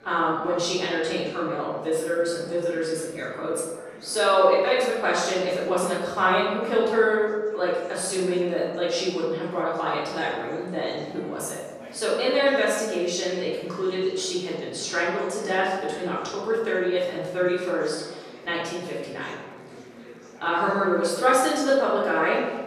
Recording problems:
off-mic speech; far
room echo; noticeable; dies away in 1.1 s
chatter from many people; faint; throughout; 20 dB below the speech

